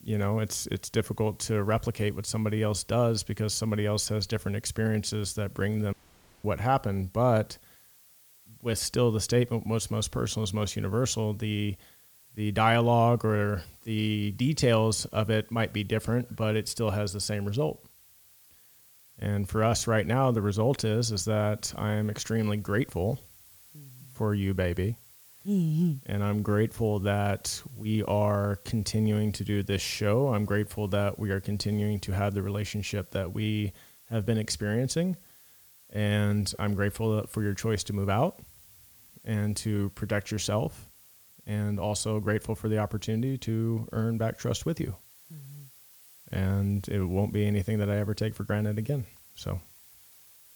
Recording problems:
hiss; faint; throughout; 25 dB below the speech
audio cutting out; at 6 s for 0.5 s

